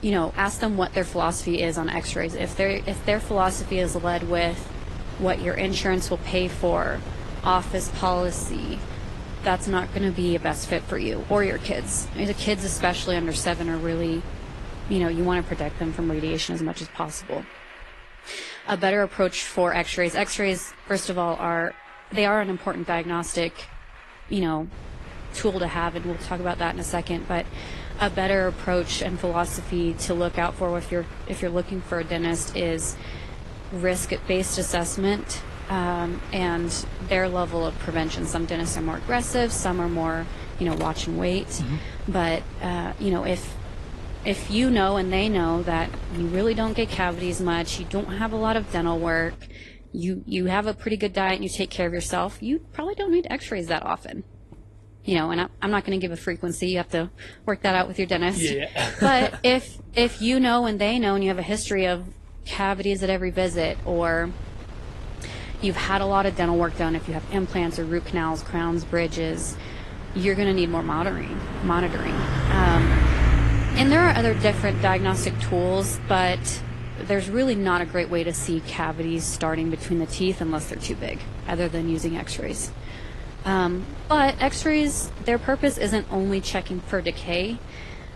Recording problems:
garbled, watery; slightly; nothing above 11 kHz
traffic noise; loud; throughout; 10 dB below the speech
wind noise on the microphone; occasional gusts; until 16 s, from 25 to 49 s and from 1:03 on; 15 dB below the speech

